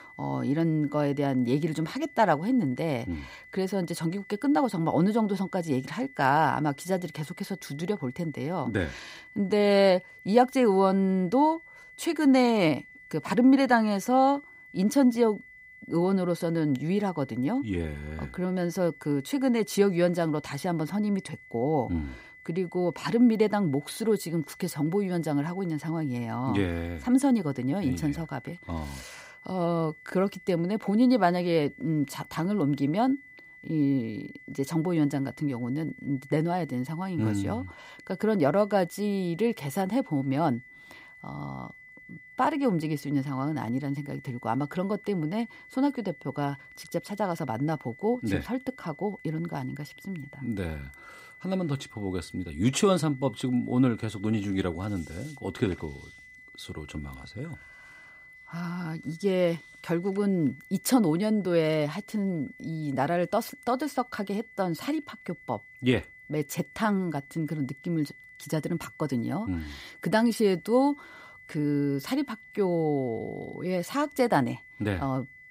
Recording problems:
high-pitched whine; faint; throughout; 2 kHz, 20 dB below the speech

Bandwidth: 15.5 kHz